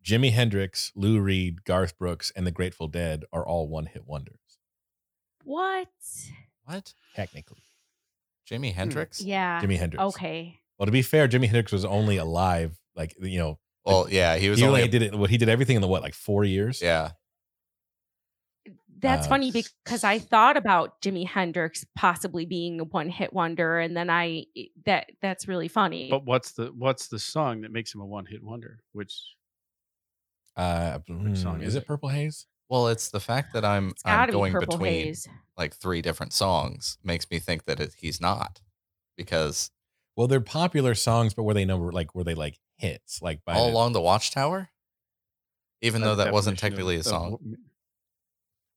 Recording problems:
none

